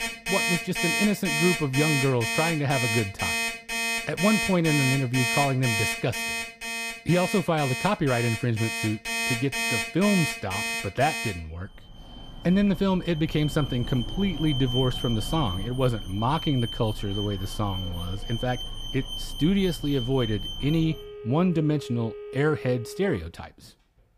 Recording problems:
alarms or sirens; loud; throughout; 3 dB below the speech

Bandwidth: 15 kHz